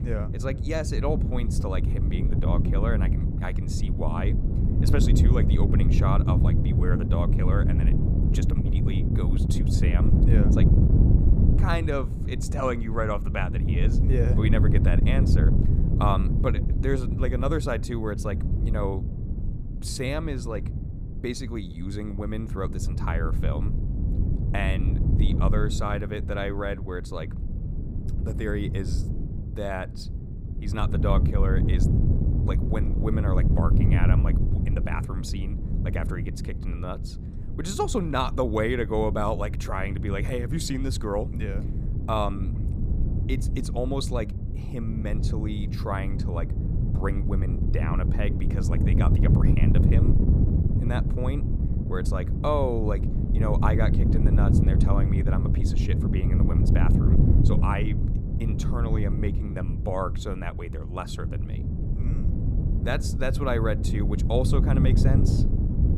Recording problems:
wind noise on the microphone; heavy; 4 dB below the speech

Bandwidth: 15 kHz